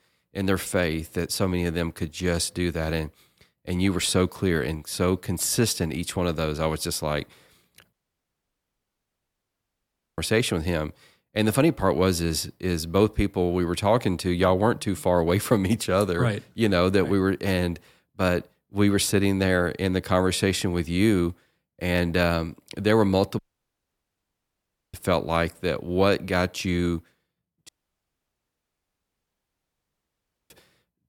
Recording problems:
audio cutting out; at 8 s for 2.5 s, at 23 s for 1.5 s and at 28 s for 3 s

